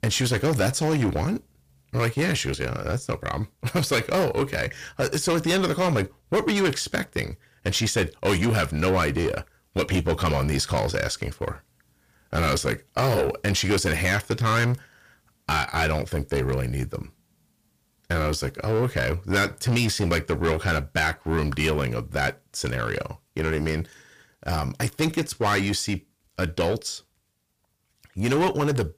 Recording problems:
distortion; heavy; 7 dB below the speech

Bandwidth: 15 kHz